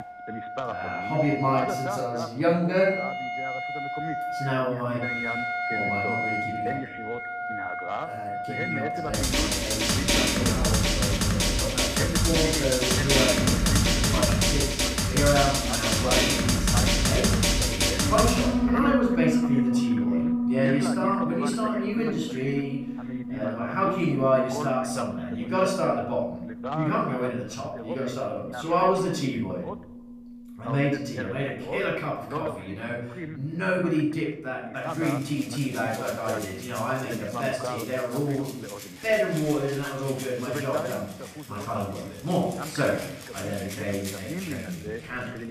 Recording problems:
off-mic speech; far
room echo; noticeable; dies away in 0.6 s
background music; very loud; throughout; 3 dB above the speech
voice in the background; loud; throughout; 9 dB below the speech

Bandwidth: 14.5 kHz